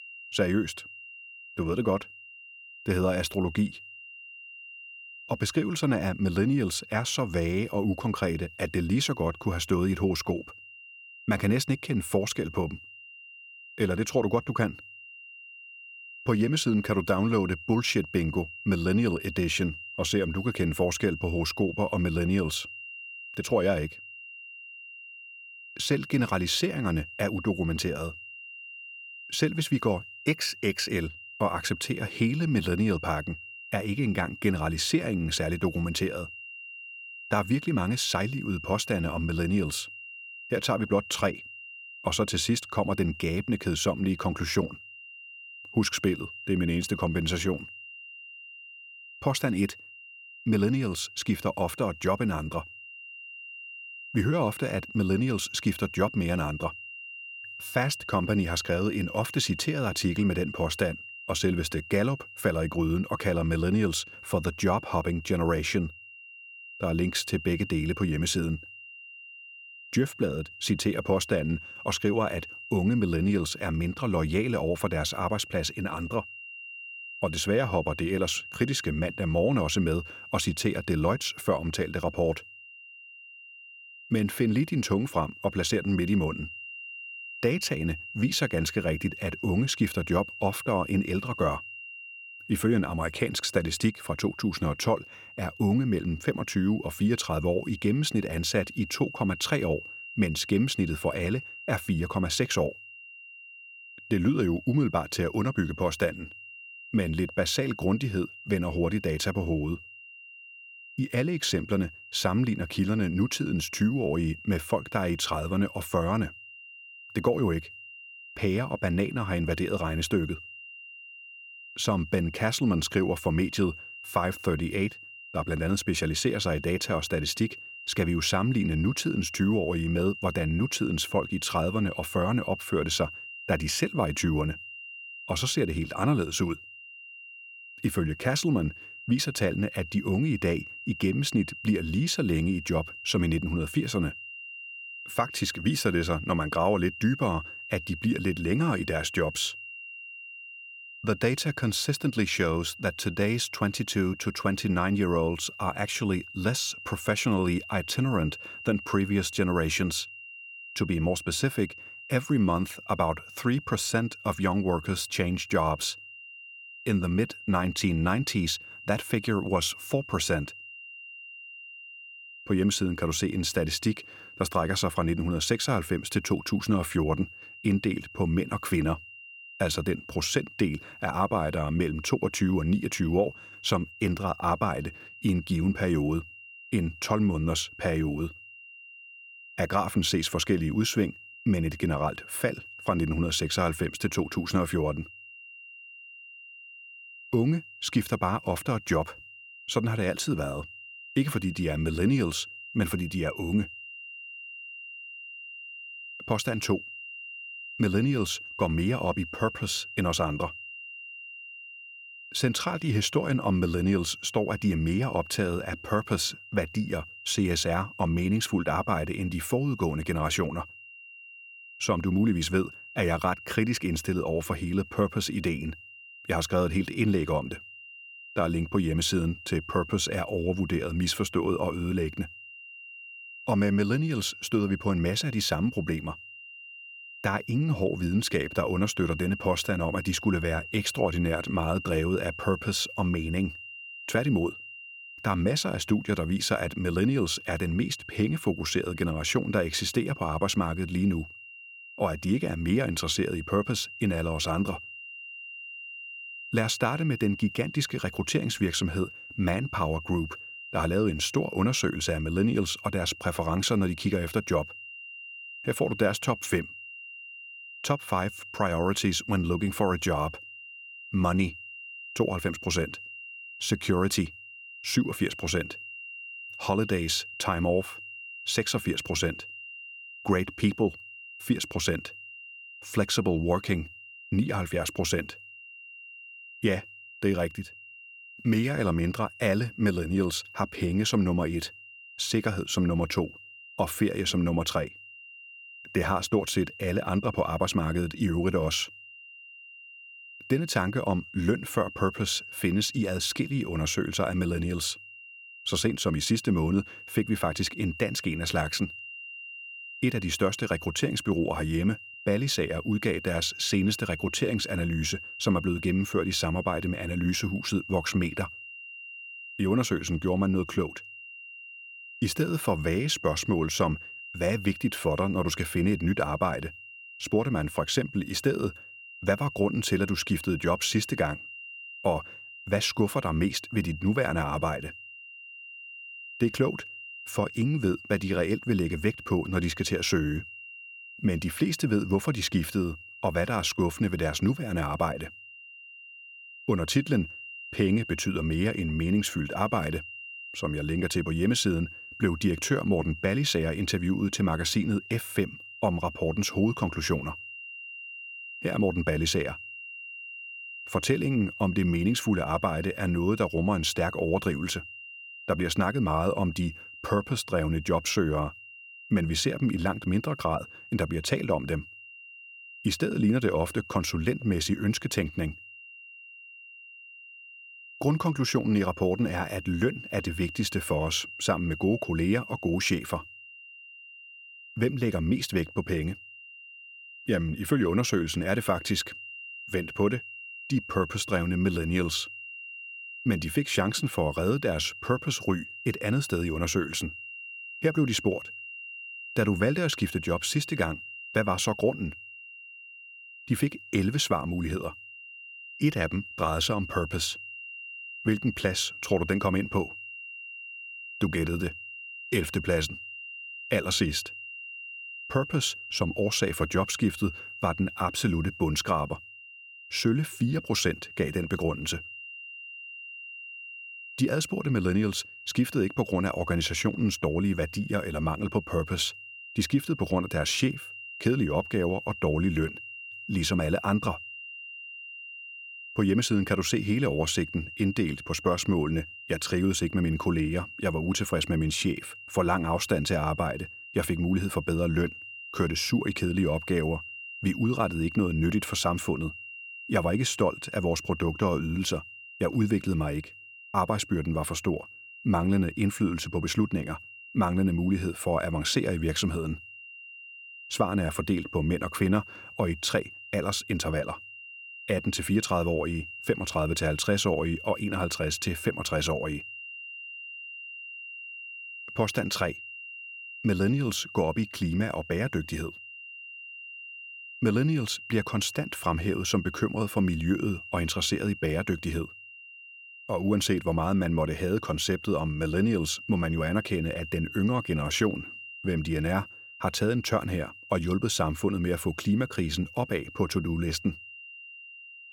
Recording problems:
high-pitched whine; noticeable; throughout; 3 kHz, 15 dB below the speech

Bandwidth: 17.5 kHz